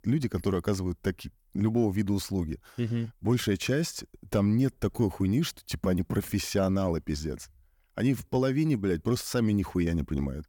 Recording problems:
none

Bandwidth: 18.5 kHz